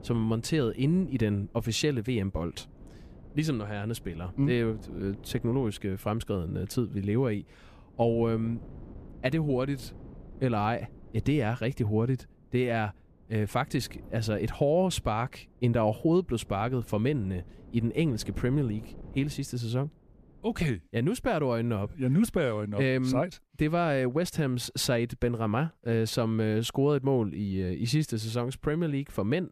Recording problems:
wind noise on the microphone; occasional gusts; until 21 s; 25 dB below the speech

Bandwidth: 14.5 kHz